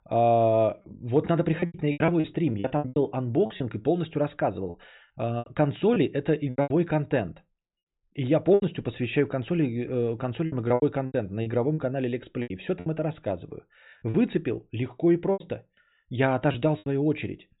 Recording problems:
high frequencies cut off; severe; nothing above 4 kHz
choppy; very; 11% of the speech affected

